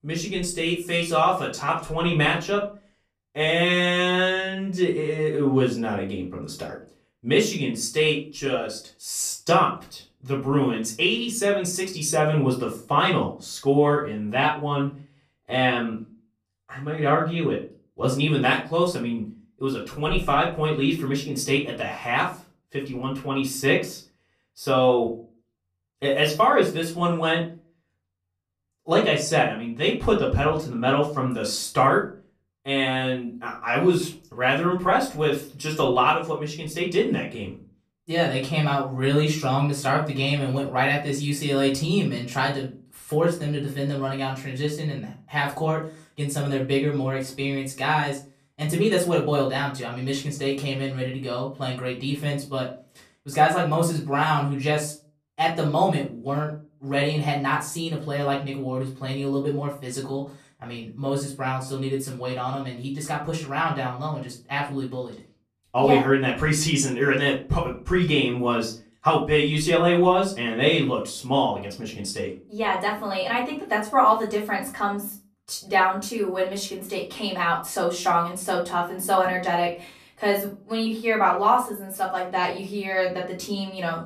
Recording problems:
off-mic speech; far
room echo; slight; dies away in 0.3 s

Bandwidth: 14.5 kHz